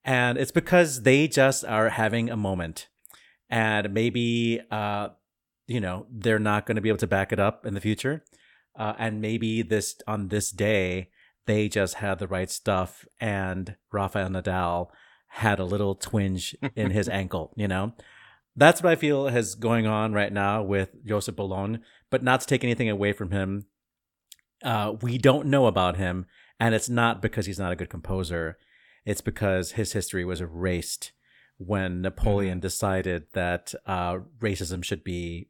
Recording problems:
none

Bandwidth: 17 kHz